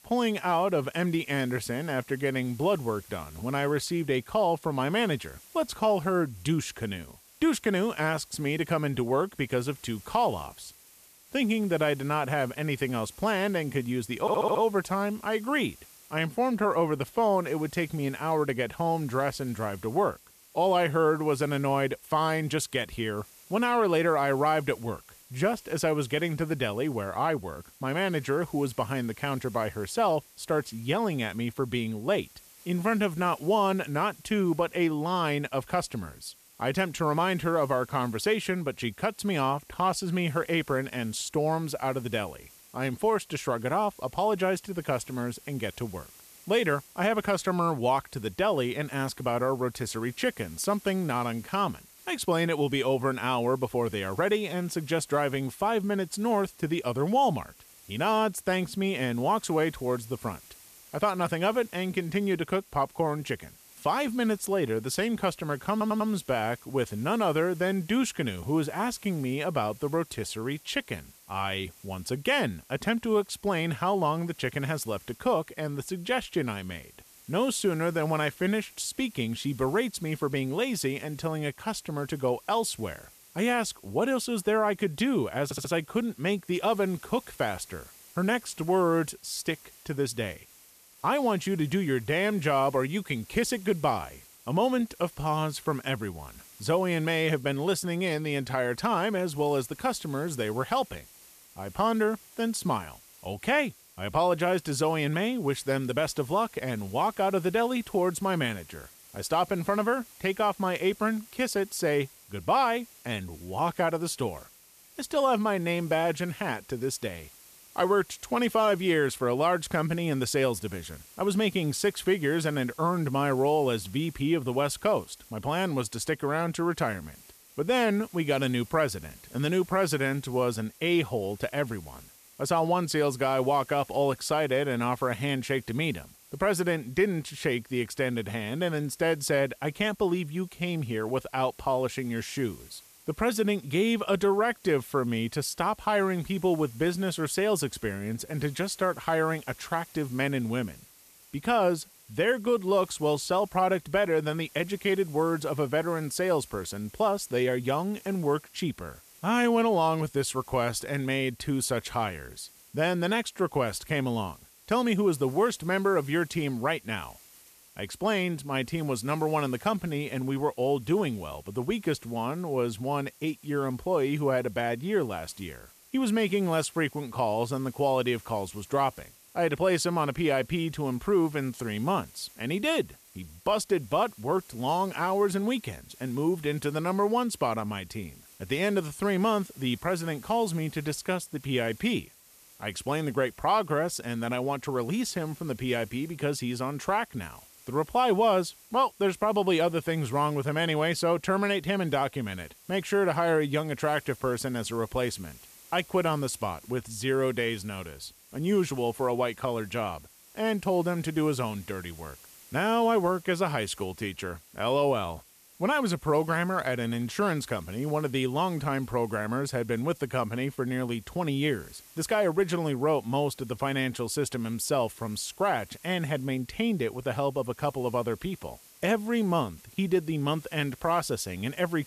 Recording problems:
hiss; faint; throughout; 25 dB below the speech
audio stuttering; at 14 s, at 1:06 and at 1:25

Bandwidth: 14.5 kHz